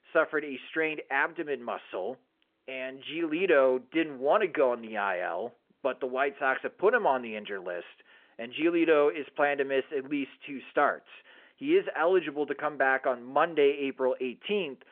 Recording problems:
phone-call audio

